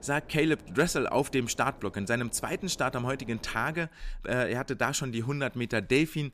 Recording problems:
wind noise on the microphone; occasional gusts; until 4 s; 25 dB below the speech

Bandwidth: 14.5 kHz